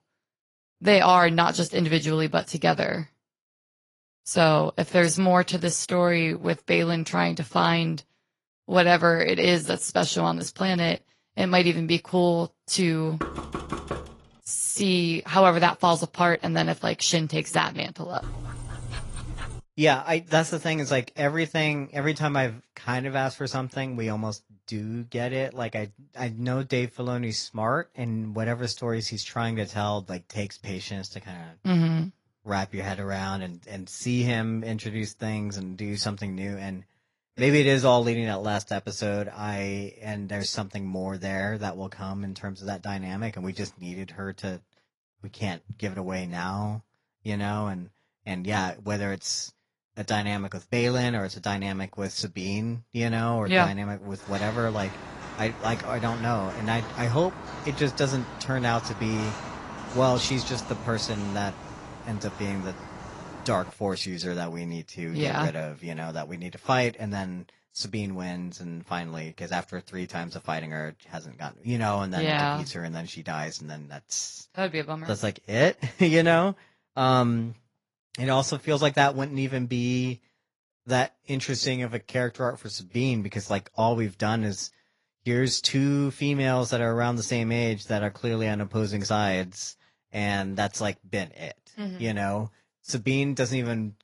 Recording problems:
garbled, watery; slightly; nothing above 11 kHz
door banging; noticeable; at 13 s; peak 7 dB below the speech
dog barking; faint; from 18 to 20 s; peak 10 dB below the speech
footsteps; noticeable; from 54 s to 1:04; peak 9 dB below the speech

